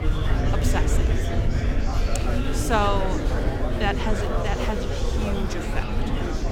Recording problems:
murmuring crowd; very loud; throughout; 1 dB above the speech
low rumble; noticeable; throughout; 15 dB below the speech

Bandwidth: 17 kHz